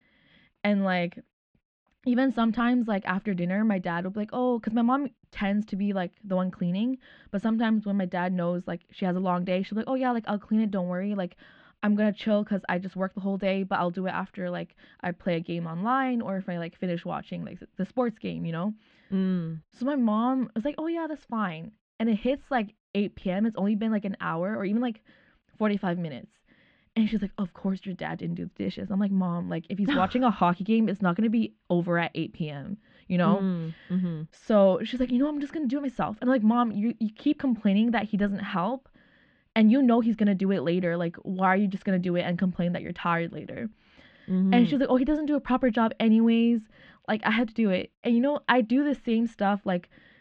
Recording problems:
muffled; very; fading above 3.5 kHz

